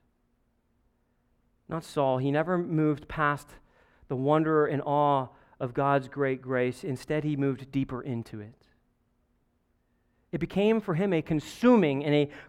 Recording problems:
muffled; slightly; fading above 3 kHz

